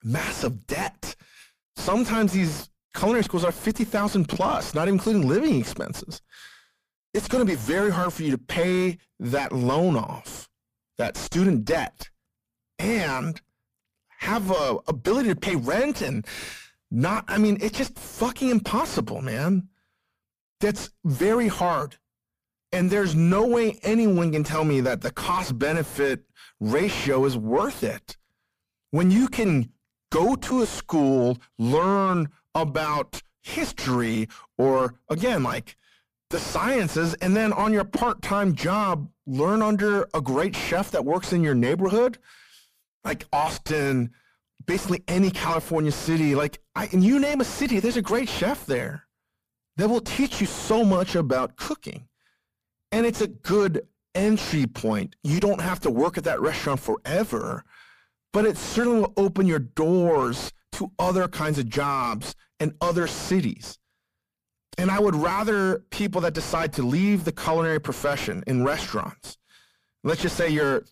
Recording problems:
distortion; heavy; 6 dB below the speech

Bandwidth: 15 kHz